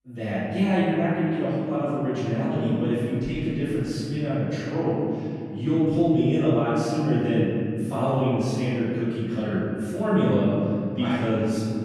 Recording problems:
room echo; strong; dies away in 2.9 s
off-mic speech; far

